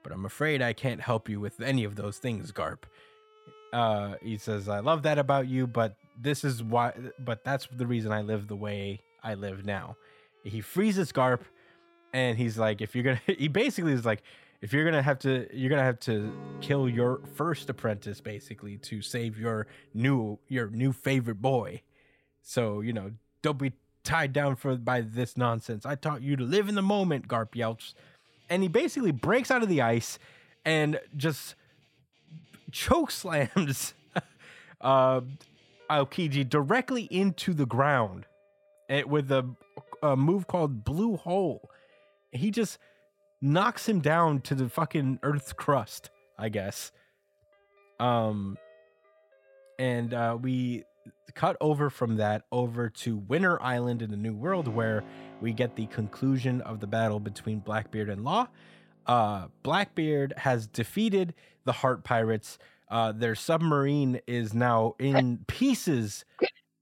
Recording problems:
background music; faint; throughout; 25 dB below the speech

